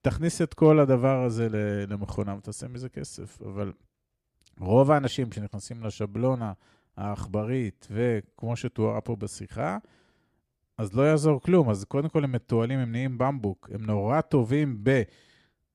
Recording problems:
none

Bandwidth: 14.5 kHz